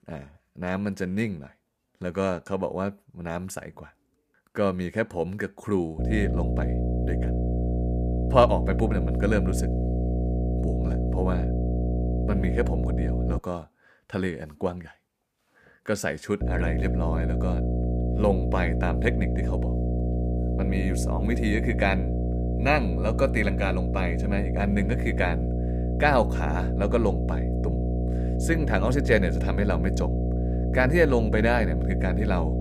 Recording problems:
electrical hum; loud; from 6 to 13 s and from 16 s on; 60 Hz, 7 dB below the speech

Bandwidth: 15 kHz